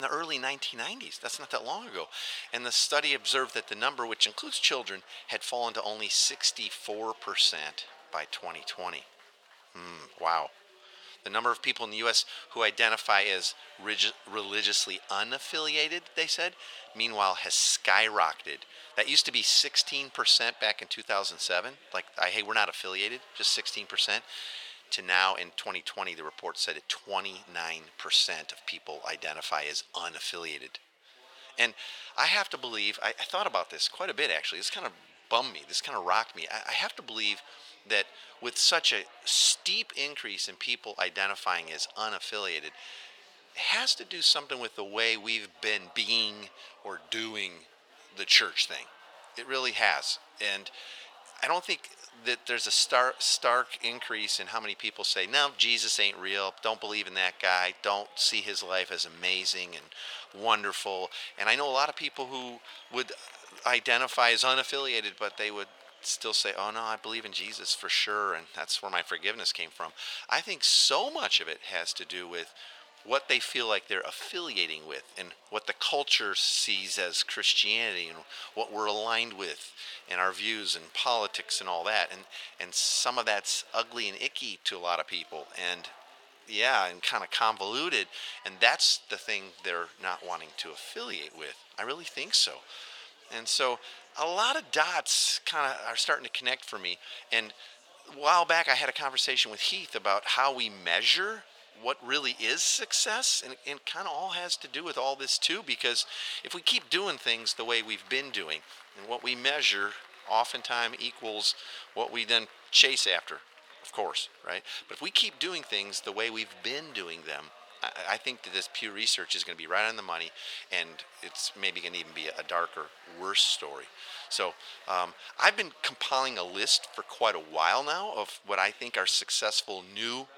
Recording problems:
thin; very; fading below 850 Hz
chatter from many people; faint; throughout; 25 dB below the speech
abrupt cut into speech; at the start

